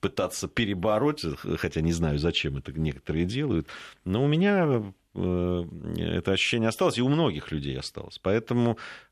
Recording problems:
none

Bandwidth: 13.5 kHz